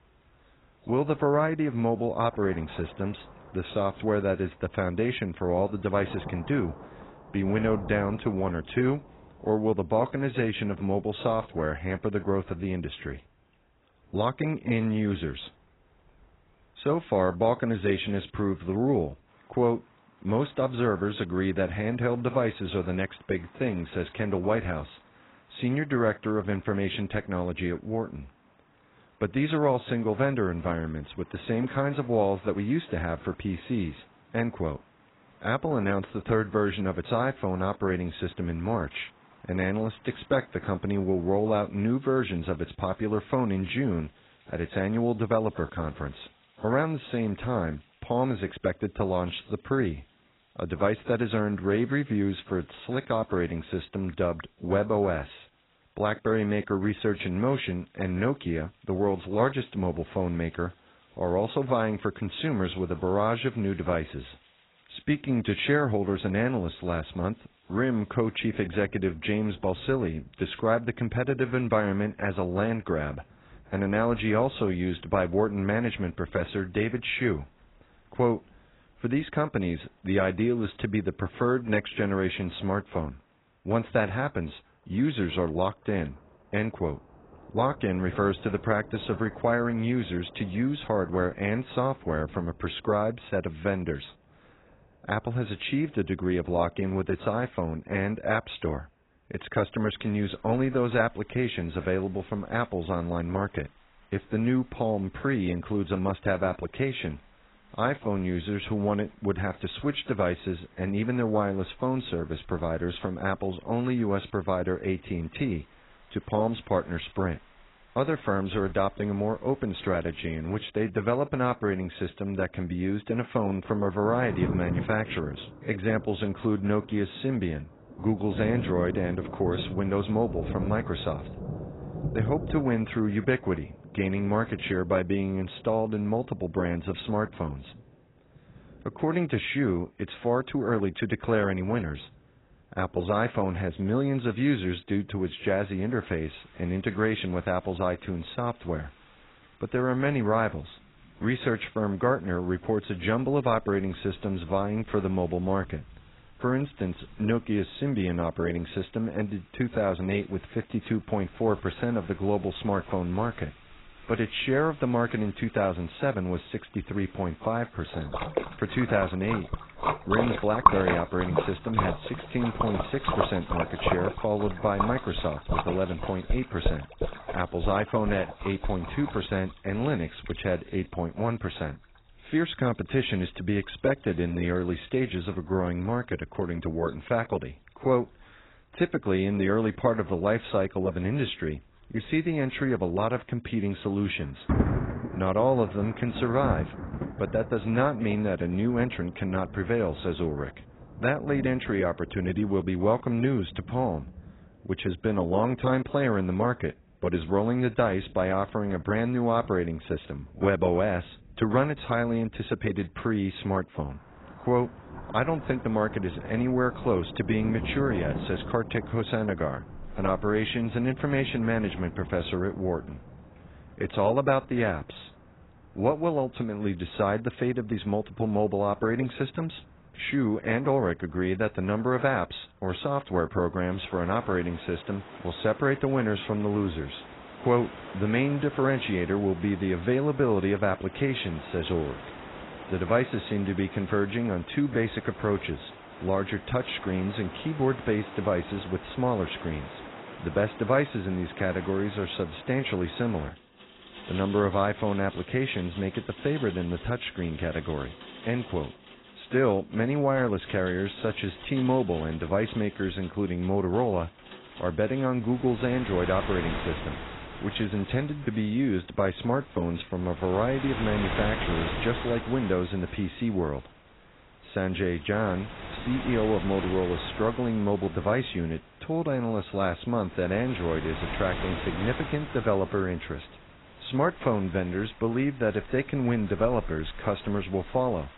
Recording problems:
garbled, watery; badly; nothing above 4 kHz
rain or running water; loud; throughout; 10 dB below the speech

